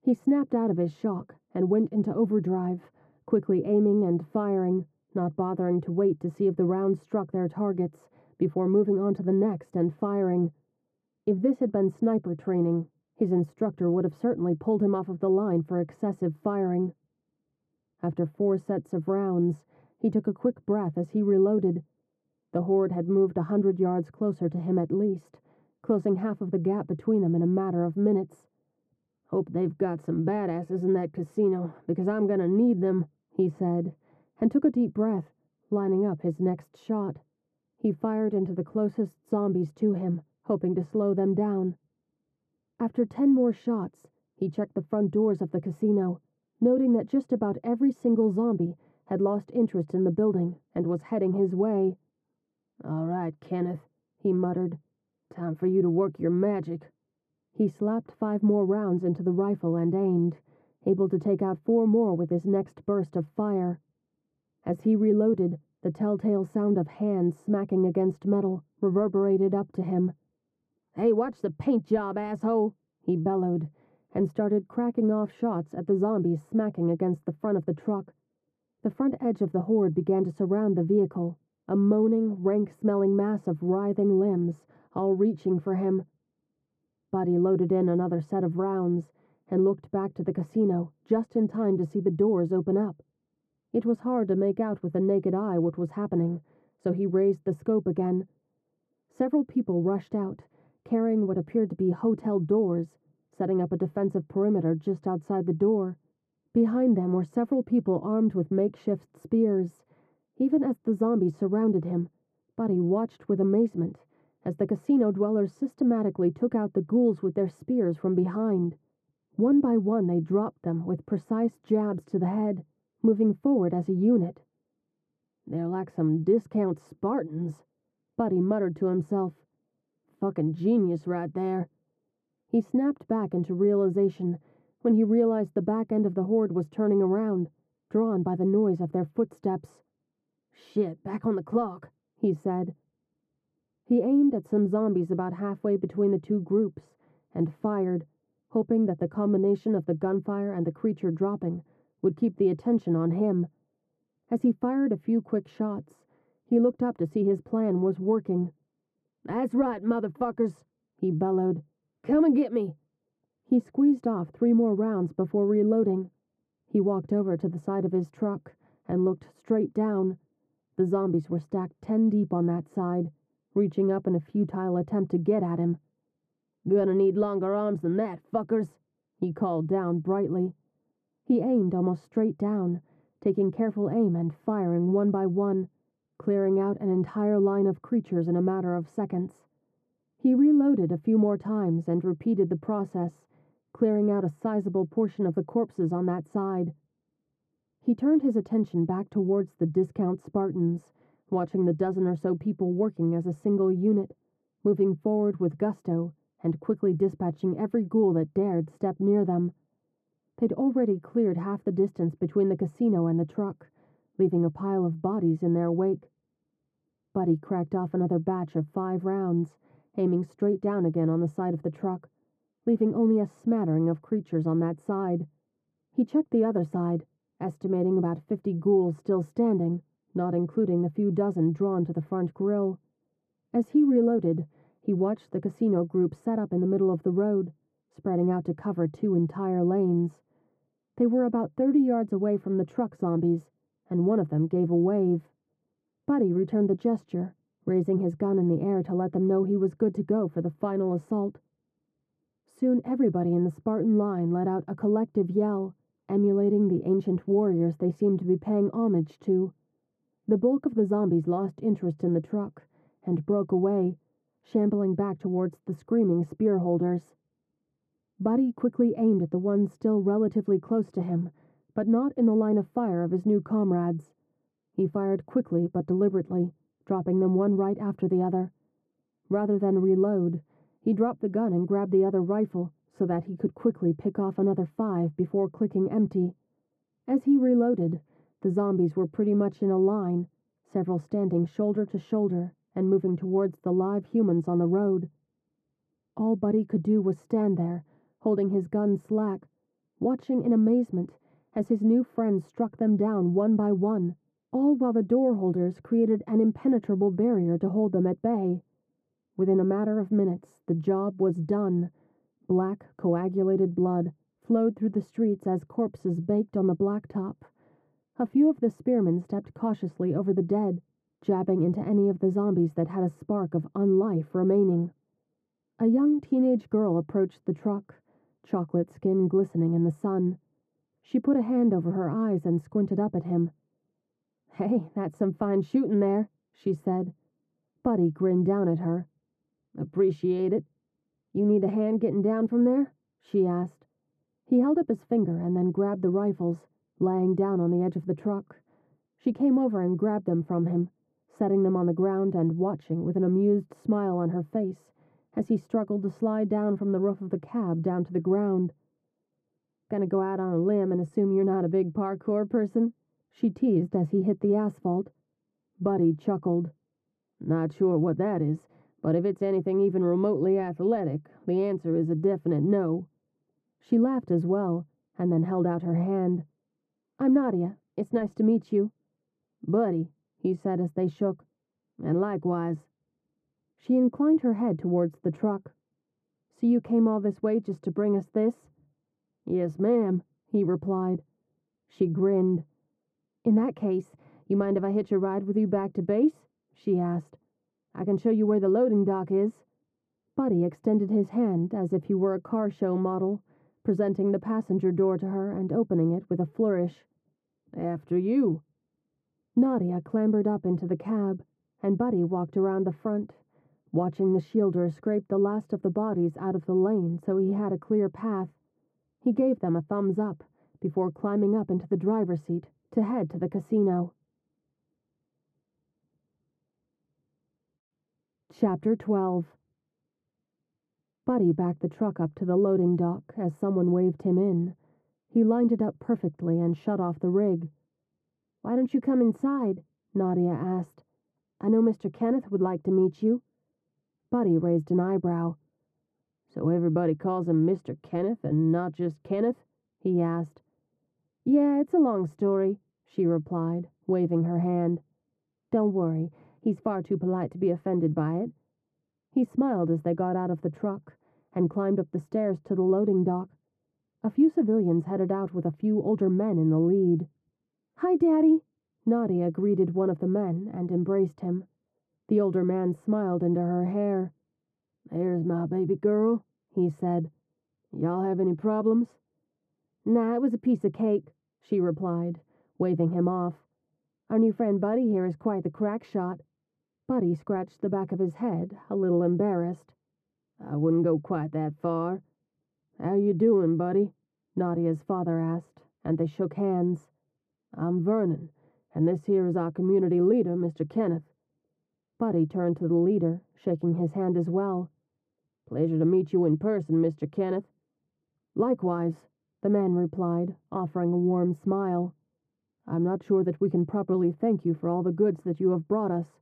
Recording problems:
muffled; very; fading above 1.5 kHz

